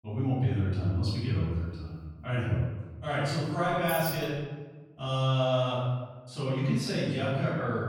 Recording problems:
room echo; strong; dies away in 1.2 s
off-mic speech; far
jangling keys; noticeable; at 3.5 s; peak 5 dB below the speech

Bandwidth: 18 kHz